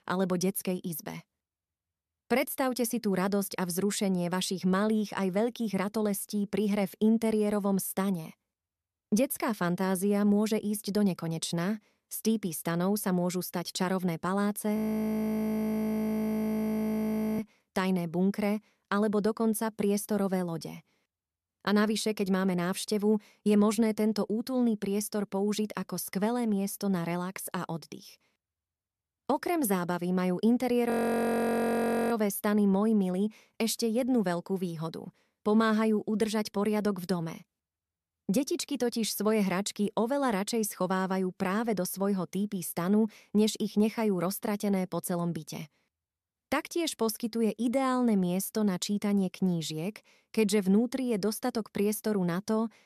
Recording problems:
audio freezing; at 15 s for 2.5 s and at 31 s for 1 s

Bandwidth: 13.5 kHz